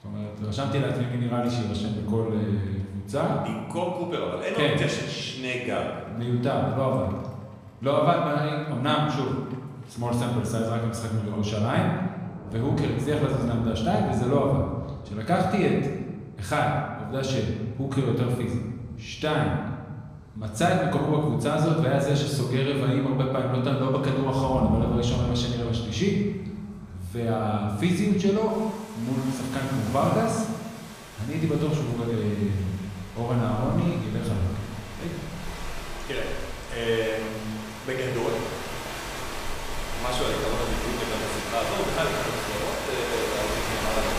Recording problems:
off-mic speech; far
room echo; noticeable; dies away in 1.2 s
rain or running water; loud; throughout; 8 dB below the speech

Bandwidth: 15 kHz